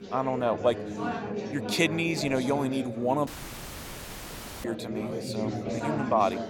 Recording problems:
chatter from many people; loud; throughout; 5 dB below the speech
audio cutting out; at 3.5 s for 1.5 s

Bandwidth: 17 kHz